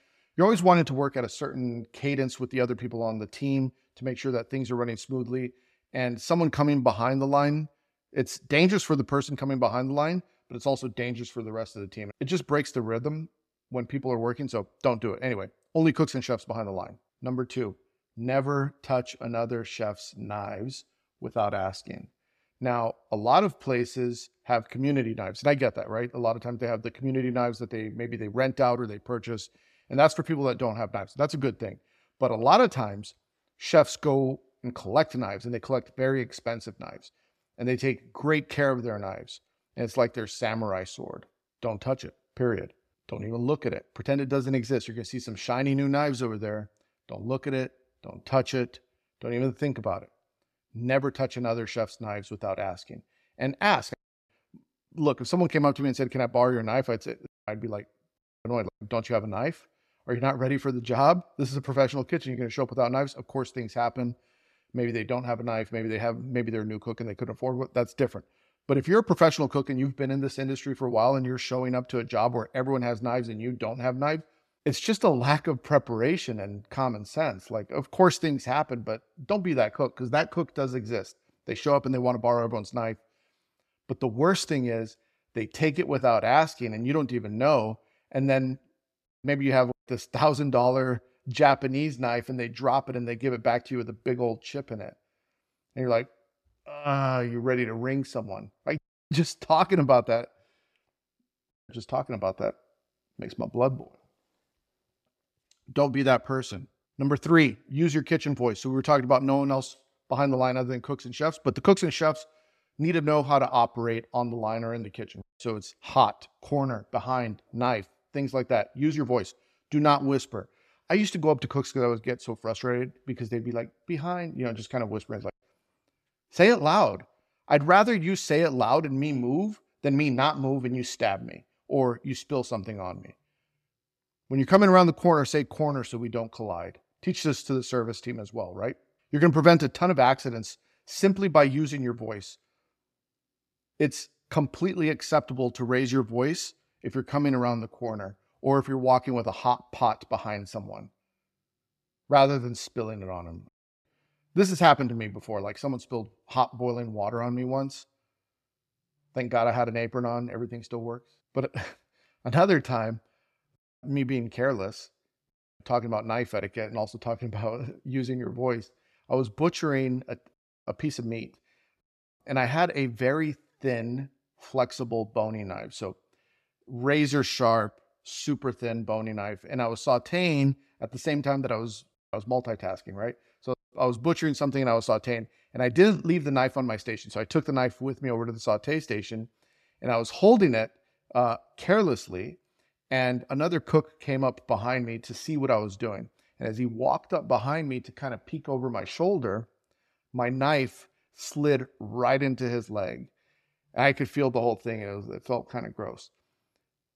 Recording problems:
none

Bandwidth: 14 kHz